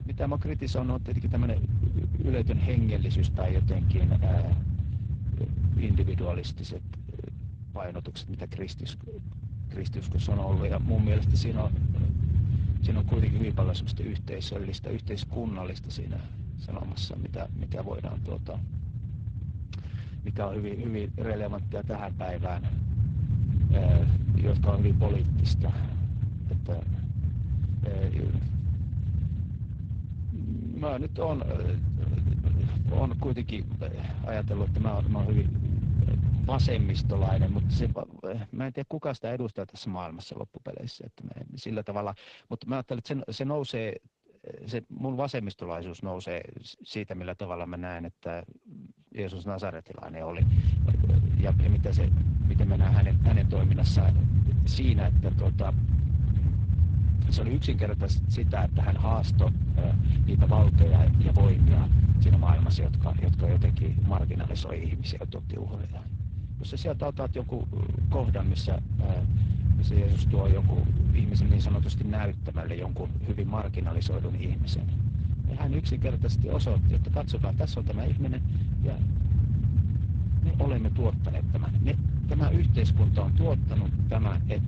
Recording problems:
garbled, watery; slightly
low rumble; loud; until 38 s and from 50 s on; 3 dB below the speech

